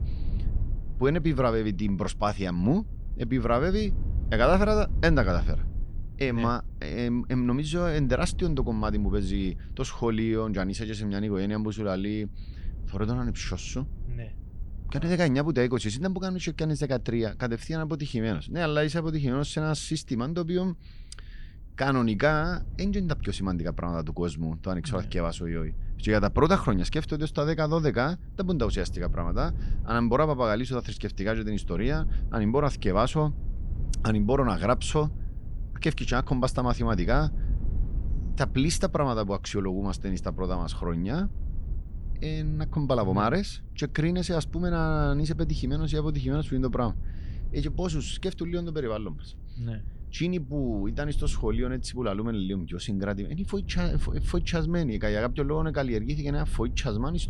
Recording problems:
low rumble; faint; throughout; 25 dB below the speech

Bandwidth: 19 kHz